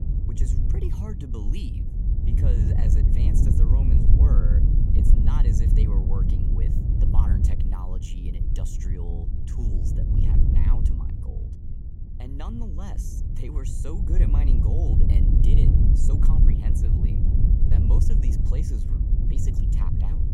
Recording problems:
wind noise on the microphone; heavy; 4 dB above the speech

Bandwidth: 16 kHz